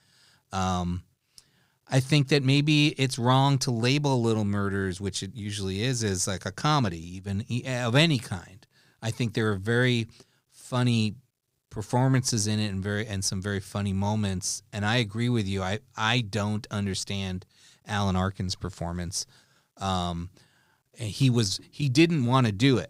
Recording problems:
none

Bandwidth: 15.5 kHz